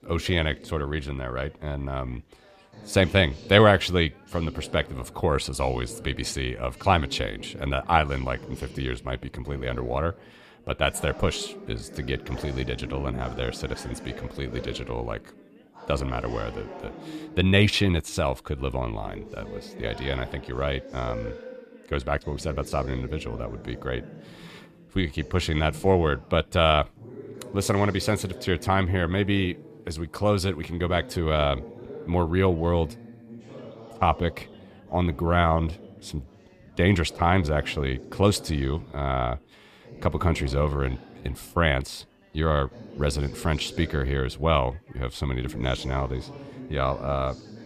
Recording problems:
background chatter; noticeable; throughout; 4 voices, 15 dB below the speech

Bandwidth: 14.5 kHz